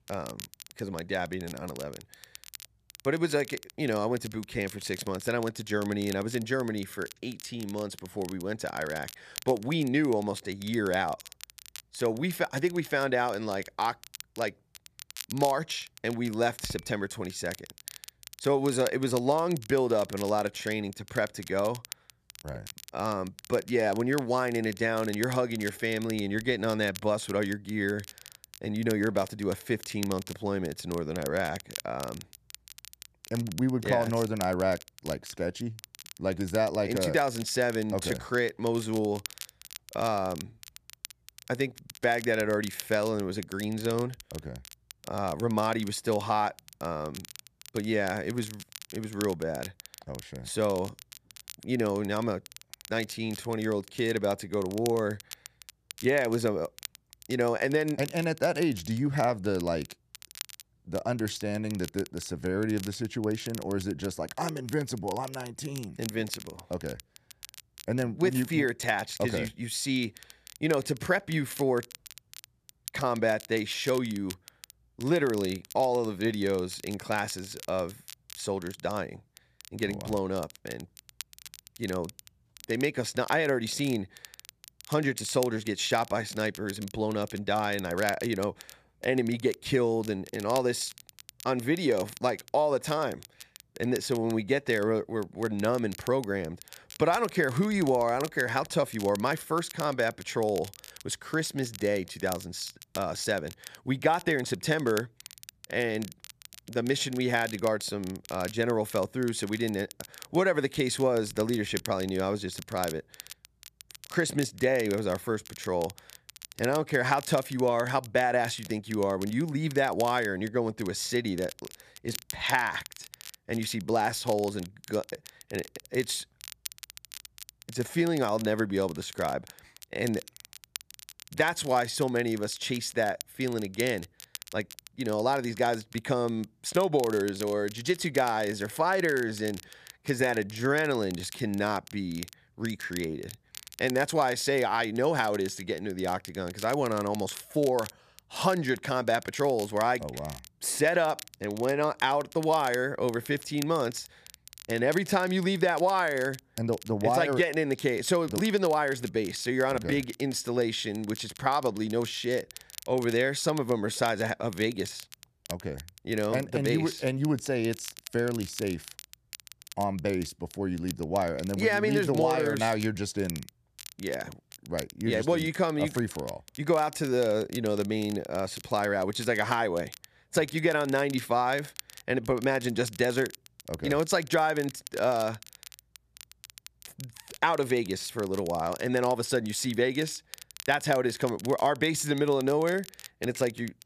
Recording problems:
crackle, like an old record; noticeable; 15 dB below the speech

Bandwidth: 14.5 kHz